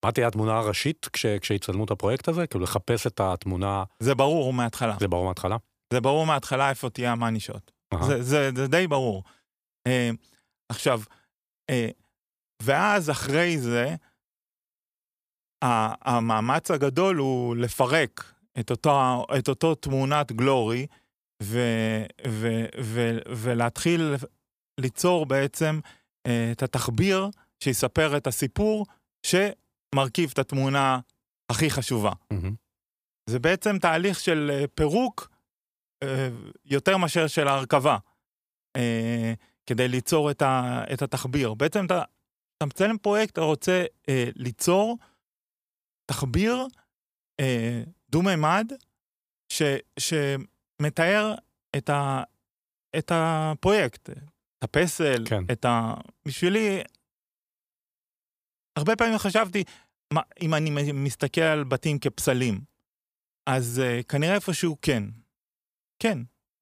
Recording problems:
none

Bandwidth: 15 kHz